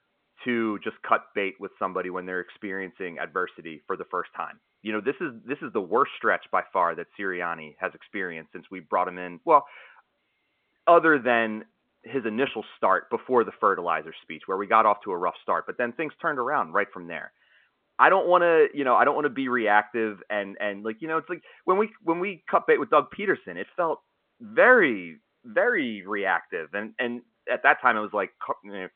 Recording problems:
phone-call audio

